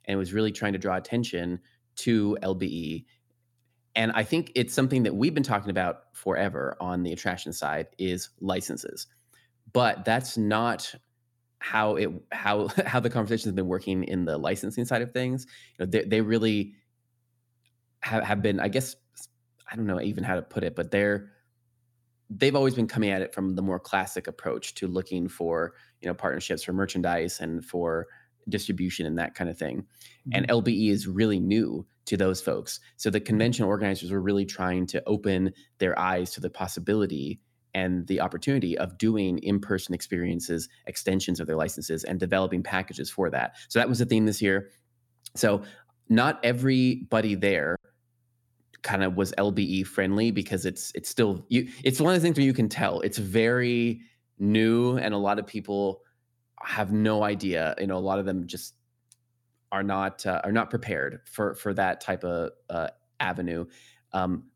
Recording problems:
choppy; very; at 48 s; 8% of the speech affected

